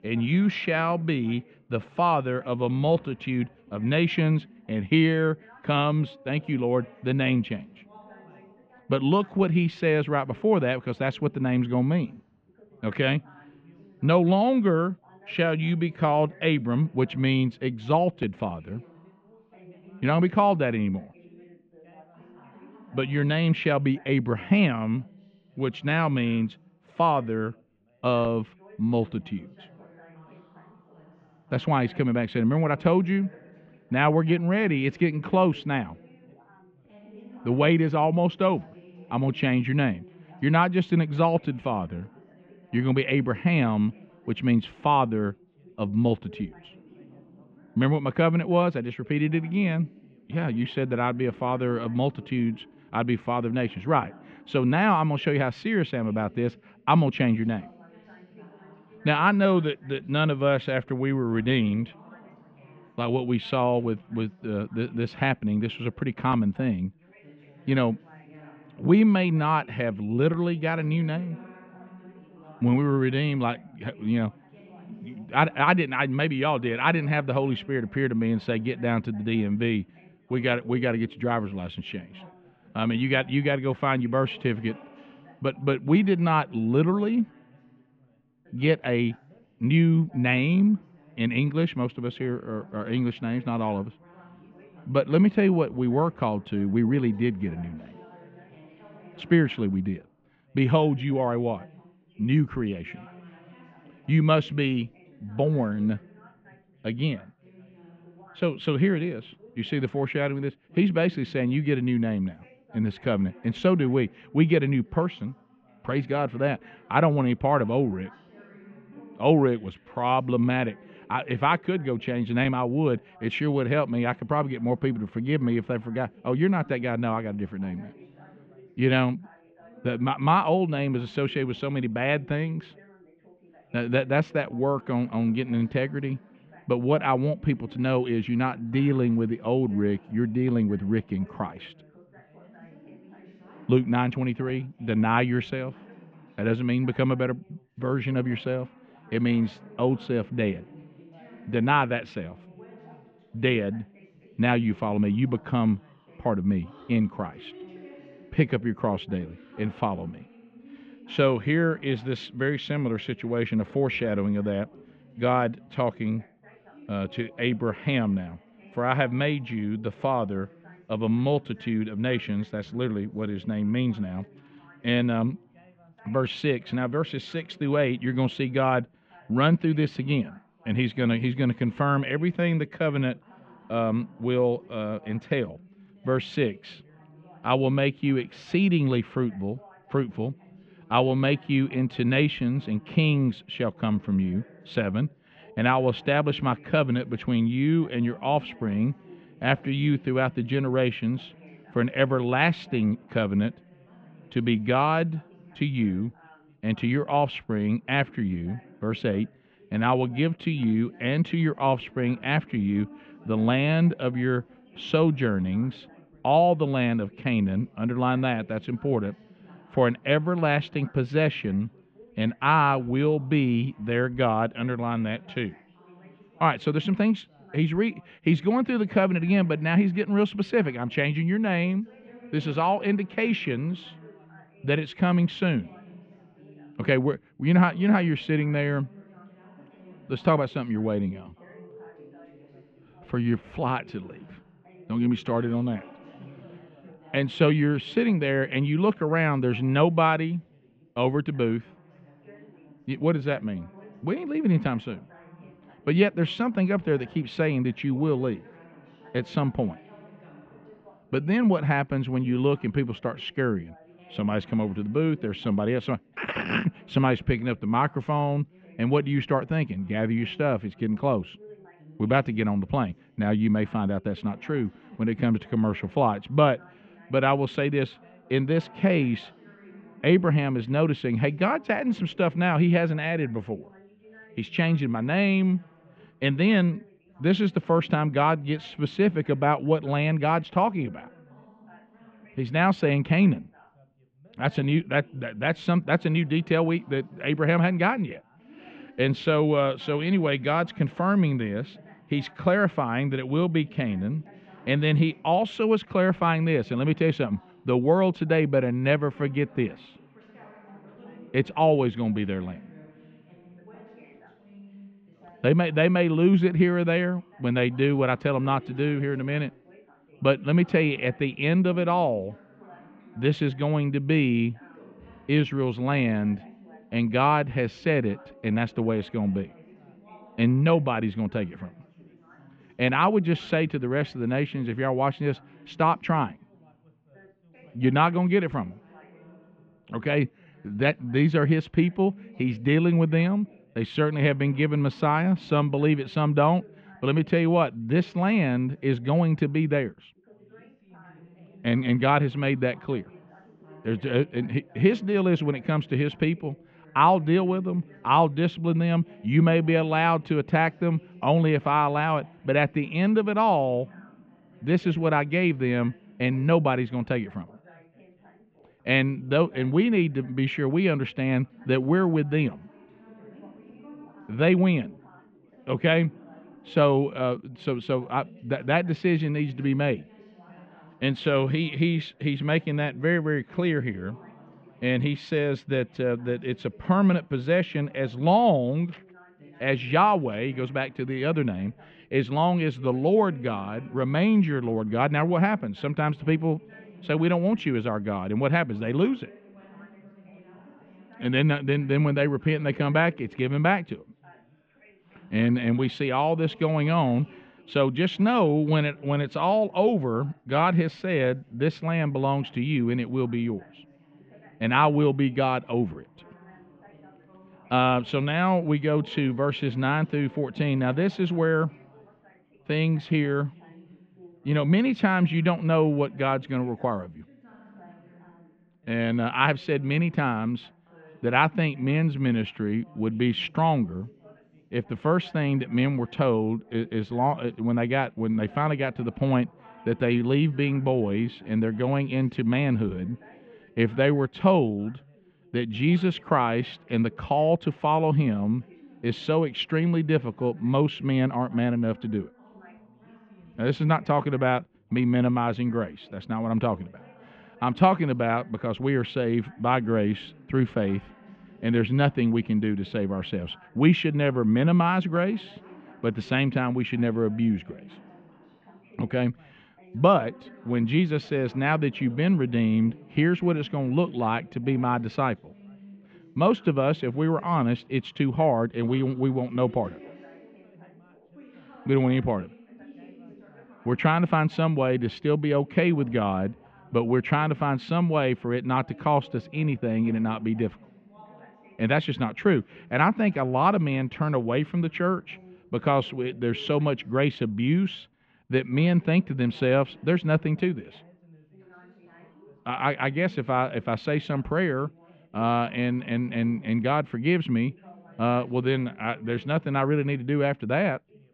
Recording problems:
muffled; very; fading above 3 kHz
background chatter; faint; throughout; 3 voices, 25 dB below the speech

